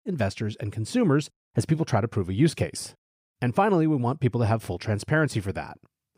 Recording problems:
none

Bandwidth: 15.5 kHz